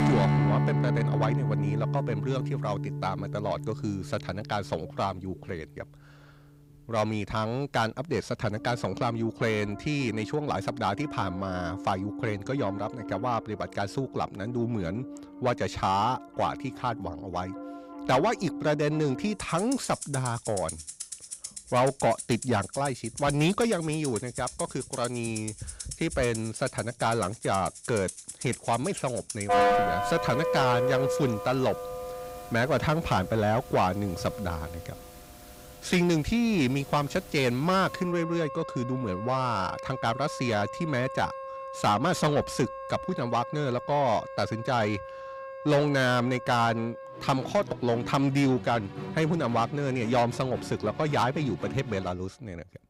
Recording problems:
distortion; slight; 10 dB below the speech
background music; loud; throughout; 6 dB below the speech

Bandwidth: 15.5 kHz